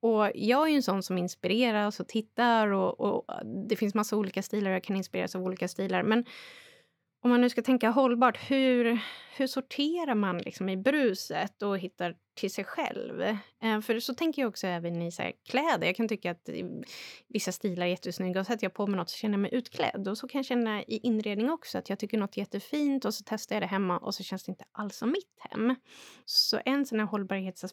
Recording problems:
none

